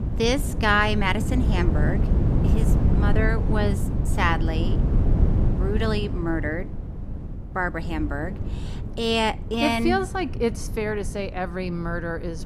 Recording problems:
wind noise on the microphone; occasional gusts; 10 dB below the speech

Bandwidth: 14.5 kHz